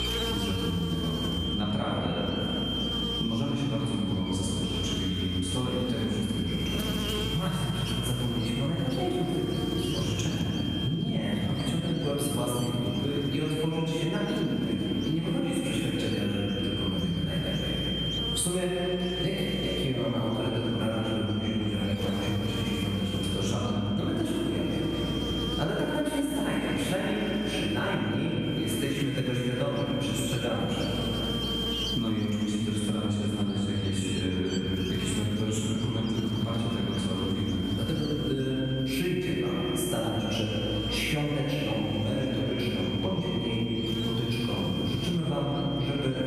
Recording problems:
room echo; strong; dies away in 2.7 s
off-mic speech; far
squashed, flat; somewhat
high-pitched whine; loud; throughout; 3 kHz, 7 dB below the speech
electrical hum; noticeable; throughout; 60 Hz, 10 dB below the speech

